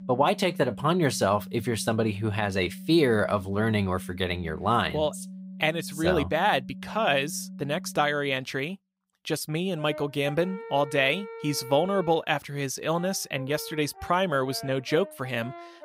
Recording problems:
background music; noticeable; throughout; 15 dB below the speech

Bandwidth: 15.5 kHz